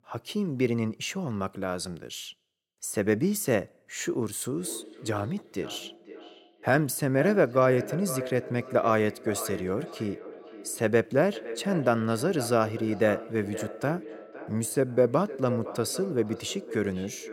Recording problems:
echo of what is said; noticeable; from 4.5 s on; 510 ms later, 10 dB below the speech

